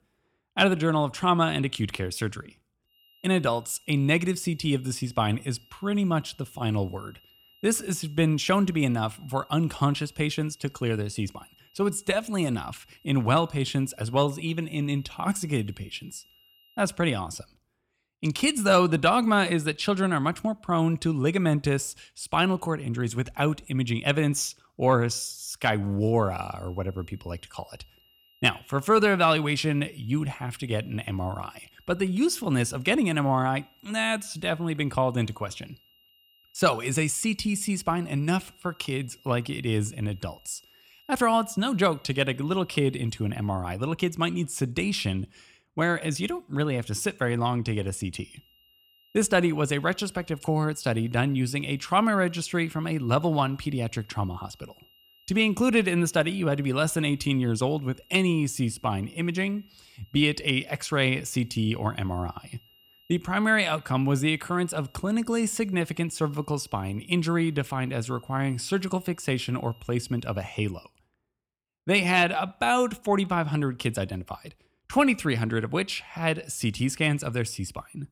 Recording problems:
high-pitched whine; faint; from 3 to 17 s, from 26 to 44 s and from 48 s to 1:10; 3 kHz, 30 dB below the speech

